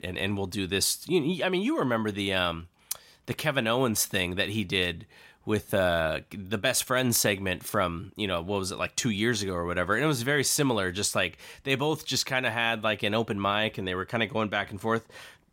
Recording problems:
none

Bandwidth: 16 kHz